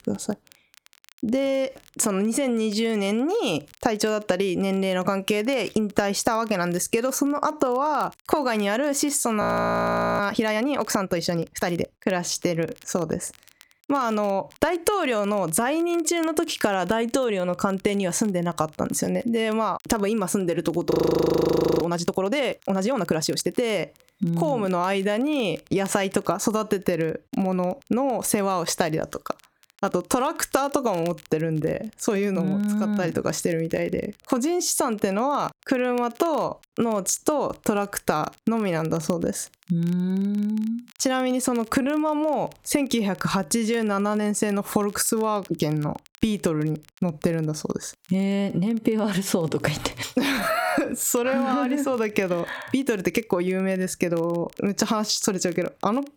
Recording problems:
squashed, flat; heavily
crackle, like an old record; faint; 30 dB below the speech
audio freezing; at 9.5 s for 1 s and at 21 s for 1 s

